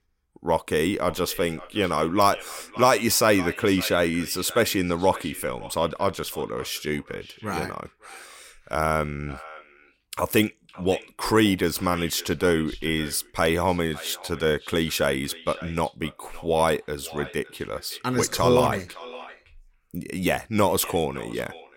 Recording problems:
echo of what is said; noticeable; throughout; 560 ms later, 20 dB below the speech

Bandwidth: 16.5 kHz